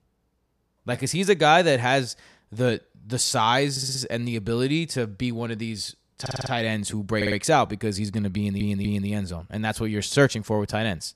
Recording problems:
audio stuttering; 4 times, first at 3.5 s

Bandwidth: 14.5 kHz